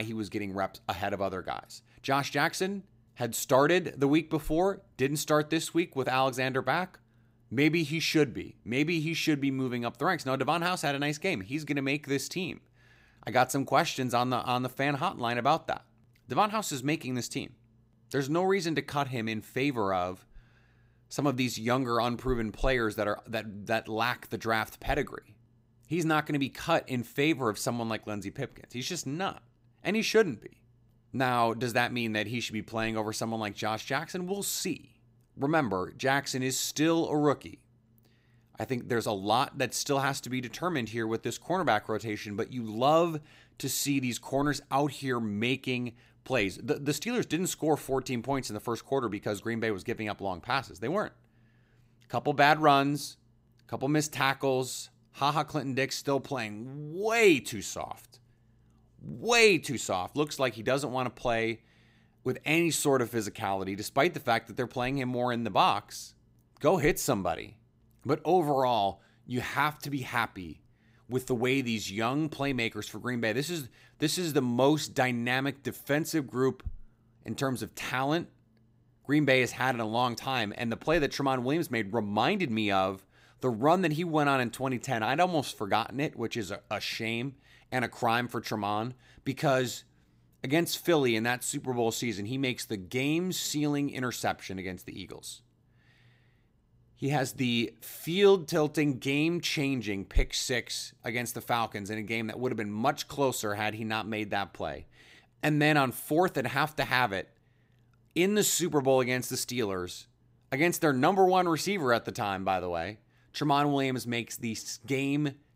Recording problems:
abrupt cut into speech; at the start

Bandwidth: 15.5 kHz